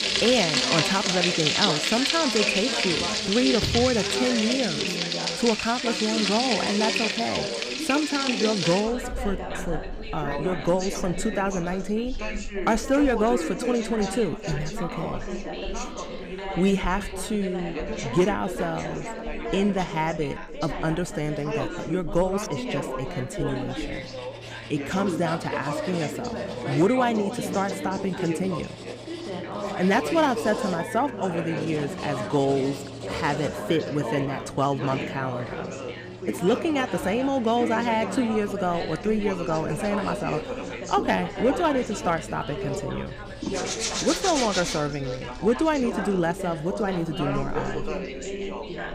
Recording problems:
echo of what is said; noticeable; from 11 s on; 300 ms later, 20 dB below the speech
household noises; loud; throughout; 1 dB below the speech
background chatter; loud; throughout; 3 voices, 6 dB below the speech
machinery noise; faint; throughout; 25 dB below the speech

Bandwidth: 15.5 kHz